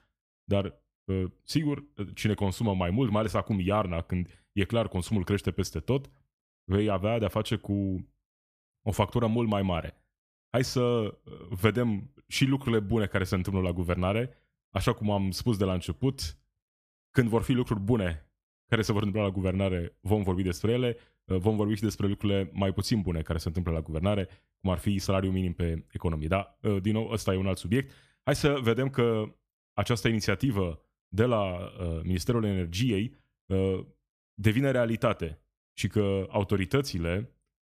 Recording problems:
none

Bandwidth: 14.5 kHz